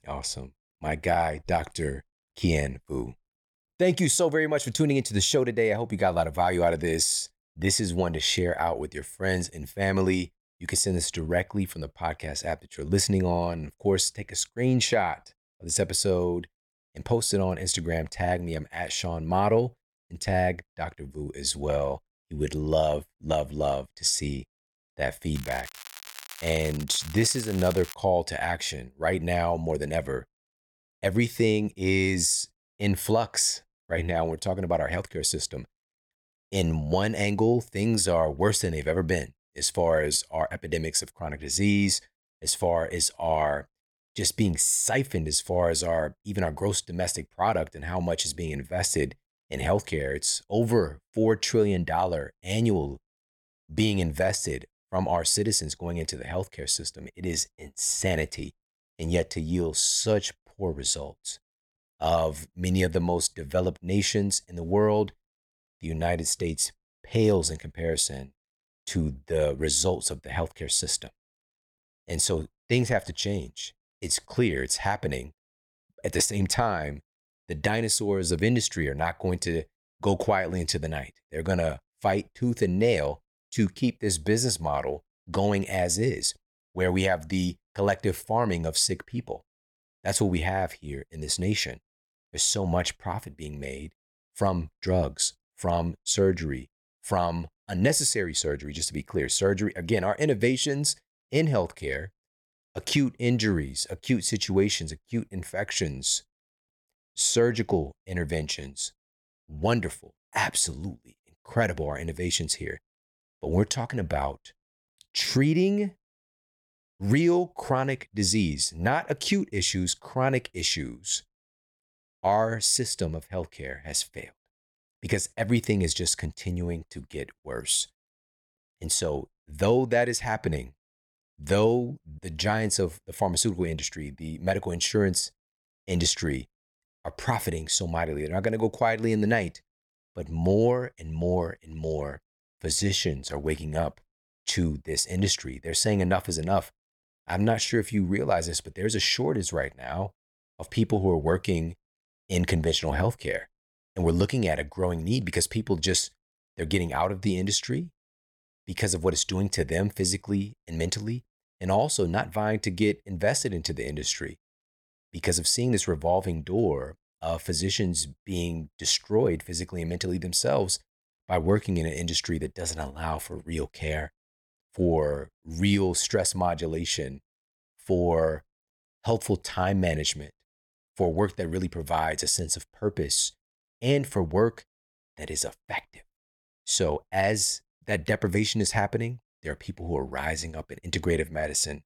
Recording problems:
crackling; noticeable; from 25 to 28 s; 15 dB below the speech

